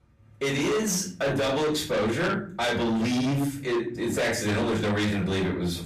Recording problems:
distortion; heavy; 7 dB below the speech
off-mic speech; far
room echo; slight; dies away in 0.4 s

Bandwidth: 14.5 kHz